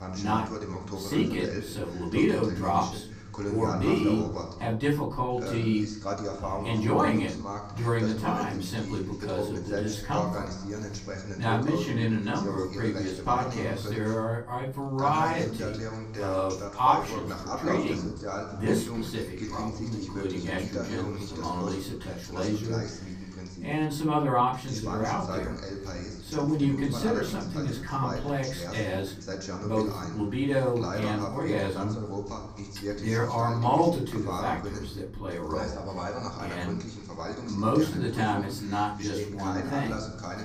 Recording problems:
off-mic speech; far
room echo; slight; dies away in 0.5 s
voice in the background; loud; throughout; 7 dB below the speech

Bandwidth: 15 kHz